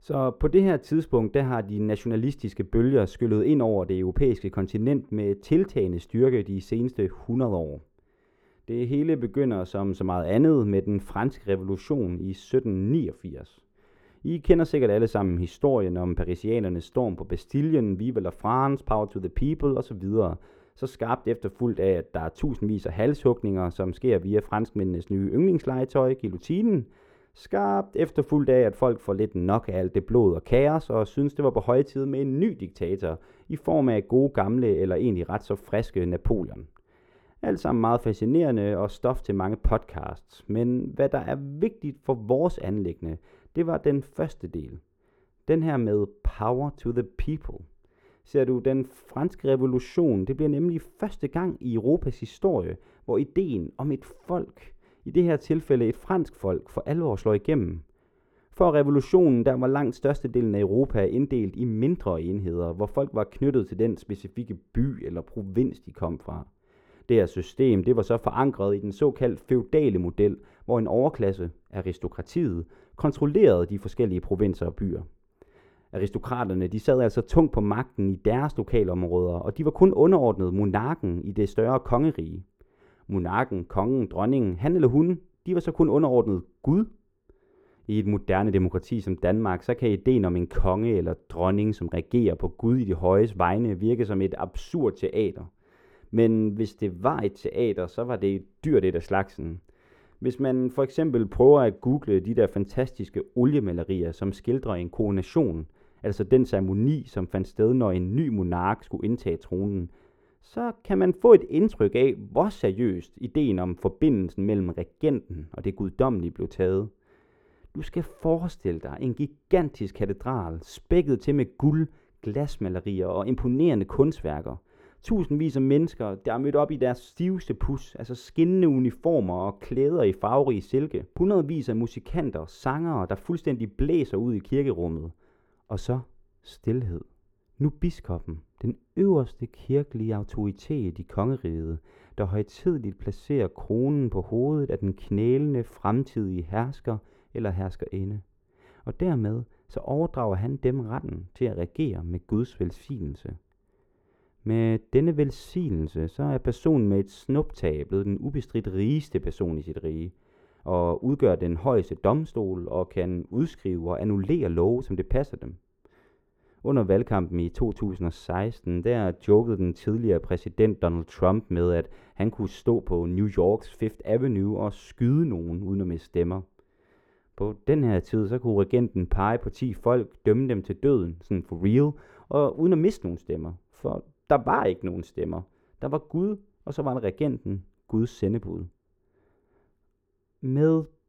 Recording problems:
muffled; very; fading above 2 kHz

